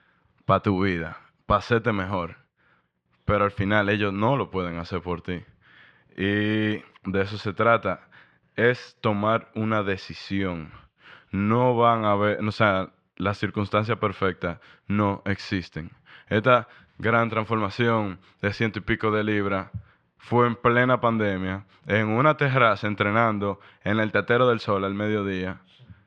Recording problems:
muffled; slightly; fading above 3 kHz

